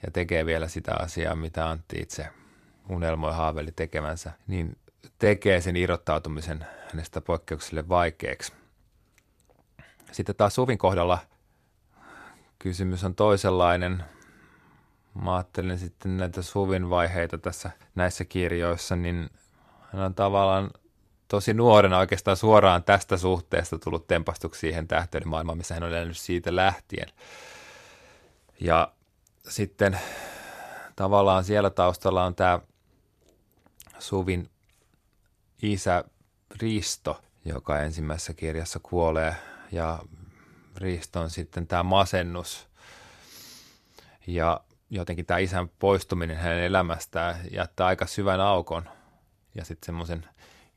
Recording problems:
uneven, jittery; strongly; from 1 to 50 s

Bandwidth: 13.5 kHz